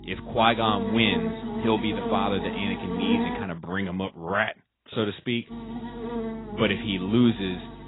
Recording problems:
garbled, watery; badly; nothing above 4 kHz
electrical hum; loud; until 3.5 s and from 5.5 s on; 50 Hz, 7 dB below the speech

